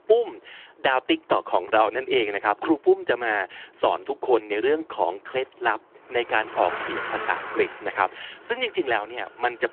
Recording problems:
phone-call audio
traffic noise; noticeable; throughout; 10 dB below the speech

